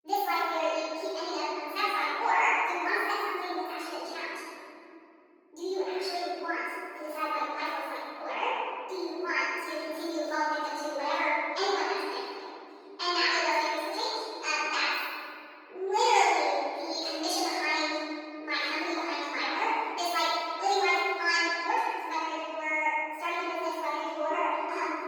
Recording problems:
room echo; strong; dies away in 2.8 s
off-mic speech; far
wrong speed and pitch; too fast and too high; 1.6 times normal speed
garbled, watery; slightly; nothing above 19 kHz
thin; very slightly; fading below 500 Hz

